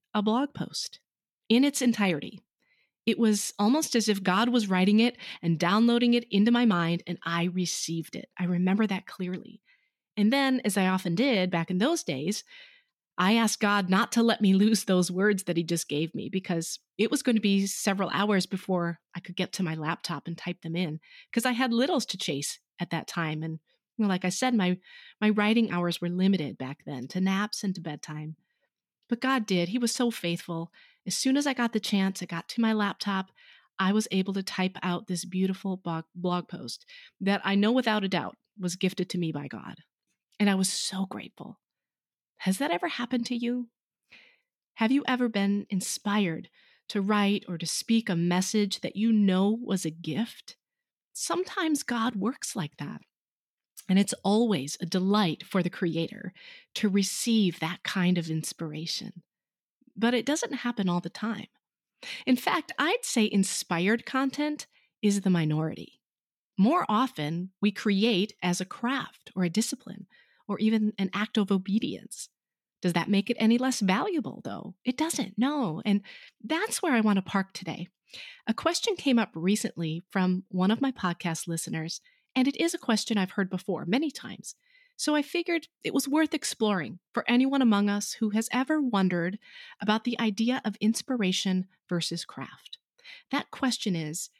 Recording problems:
none

